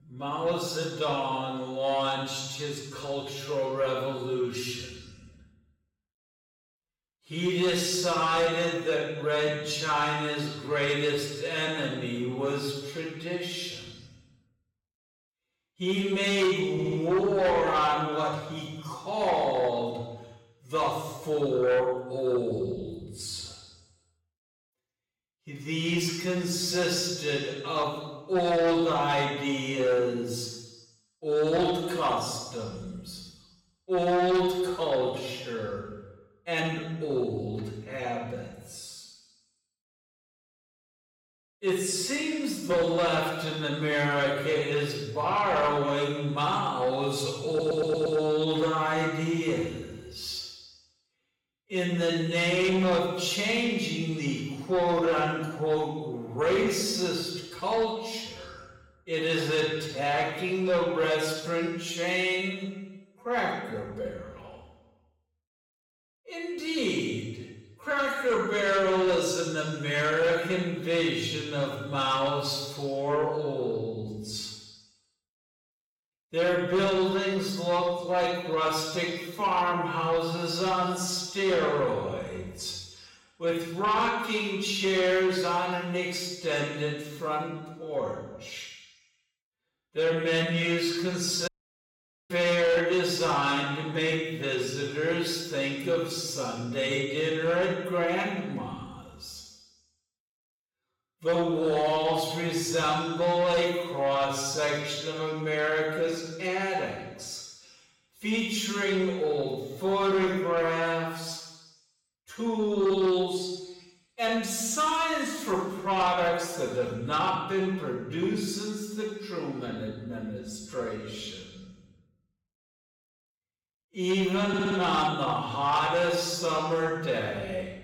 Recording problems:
off-mic speech; far
wrong speed, natural pitch; too slow; 0.5 times normal speed
room echo; noticeable; dies away in 1.1 s
distortion; slight; 10 dB below the speech
audio stuttering; at 17 s, at 47 s and at 2:04
audio cutting out; at 1:31 for 1 s

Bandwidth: 16 kHz